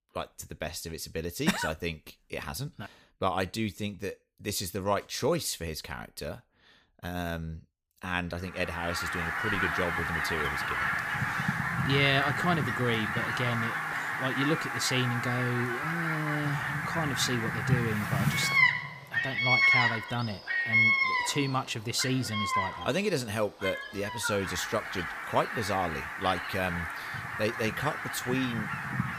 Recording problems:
animal sounds; very loud; from 9 s on; 3 dB above the speech

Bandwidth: 15 kHz